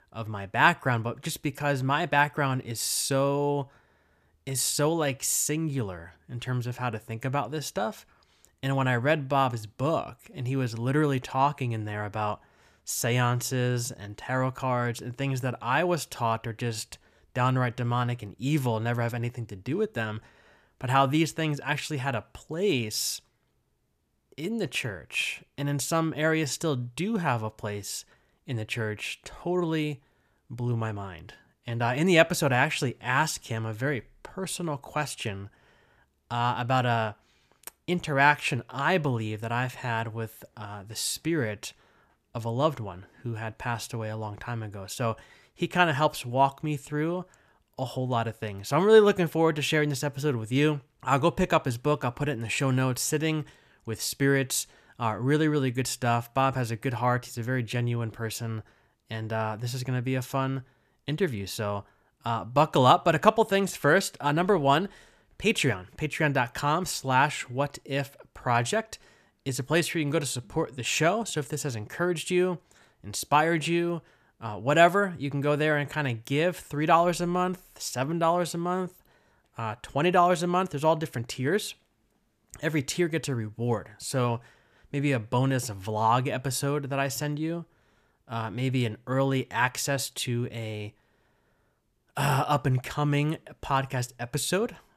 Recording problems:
none

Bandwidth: 14.5 kHz